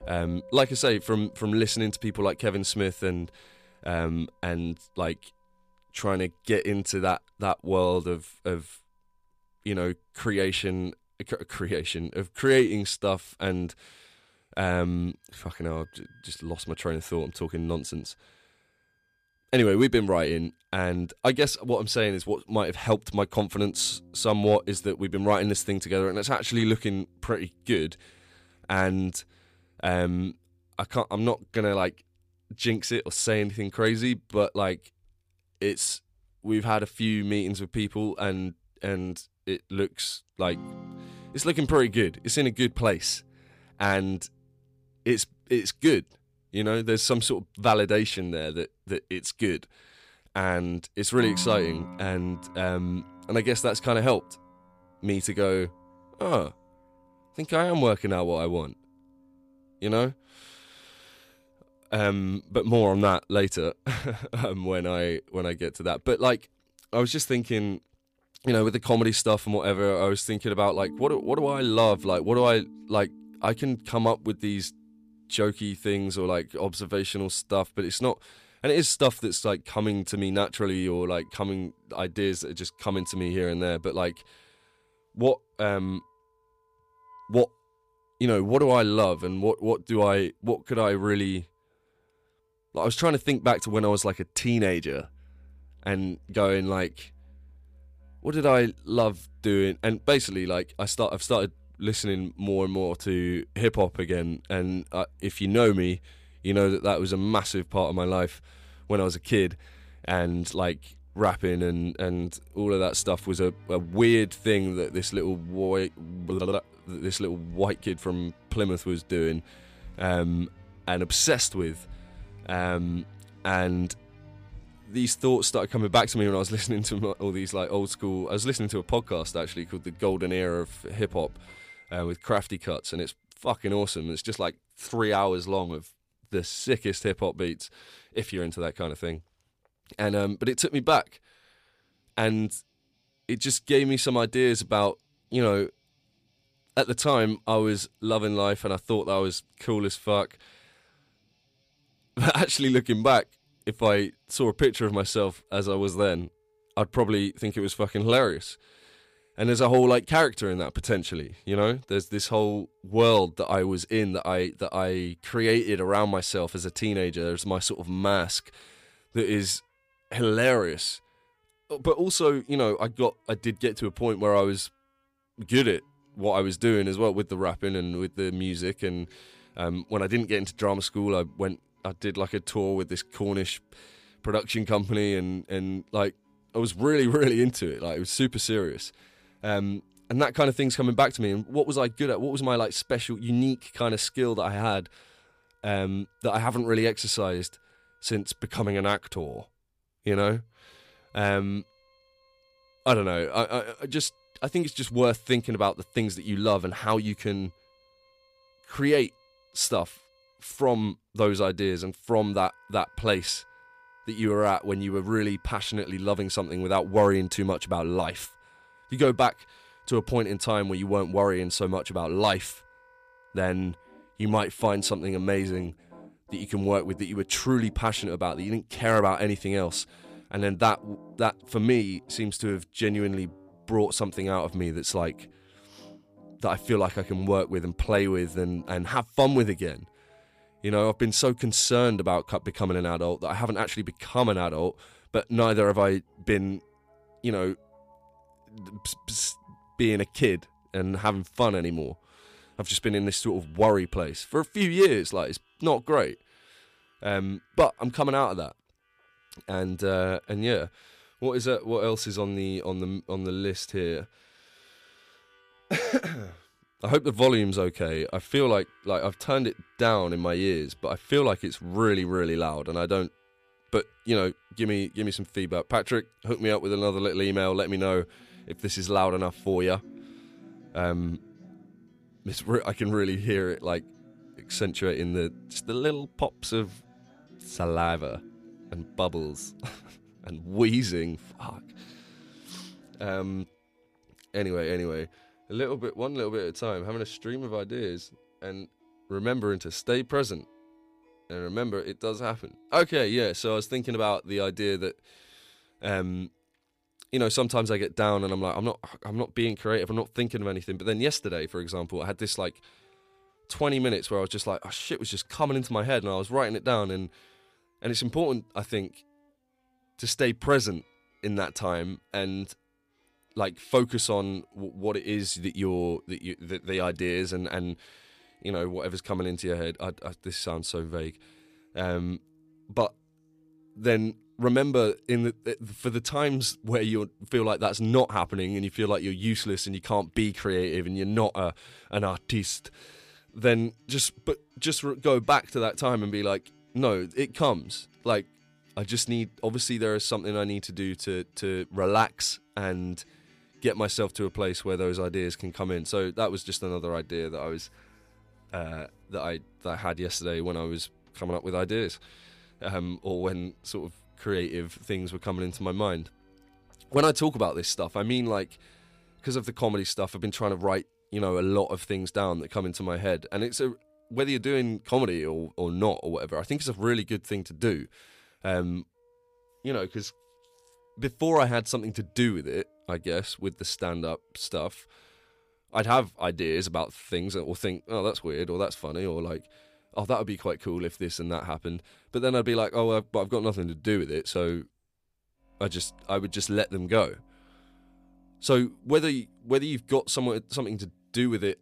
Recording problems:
background music; faint; throughout; 25 dB below the speech

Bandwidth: 15 kHz